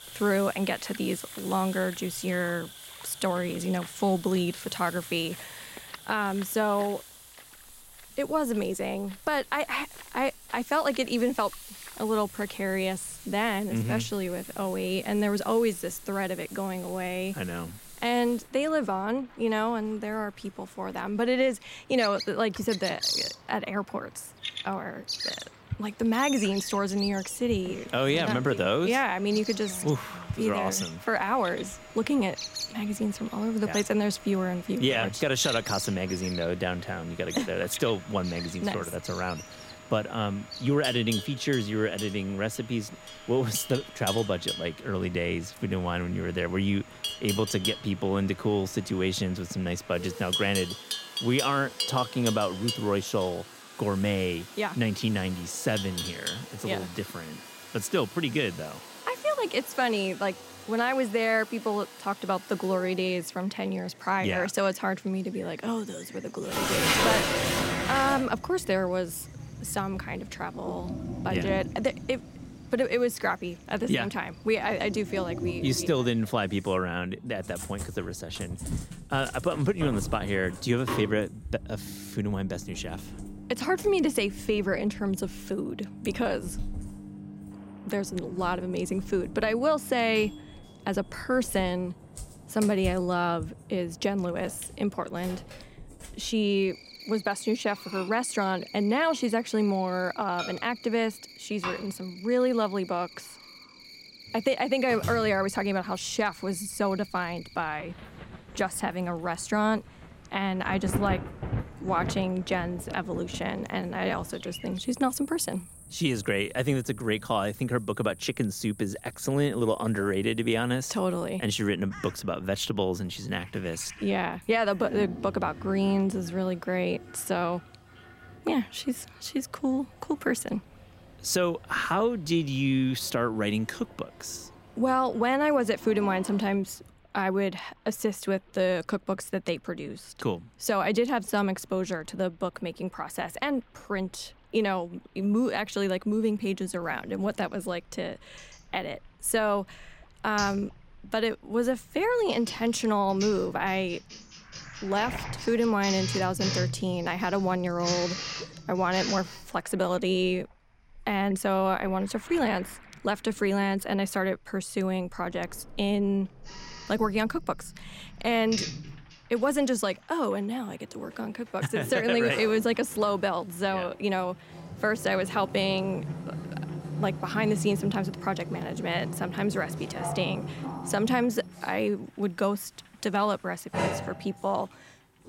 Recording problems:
animal sounds; noticeable; until 2:06; 10 dB below the speech
household noises; noticeable; throughout; 10 dB below the speech
rain or running water; faint; throughout; 20 dB below the speech

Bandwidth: 16 kHz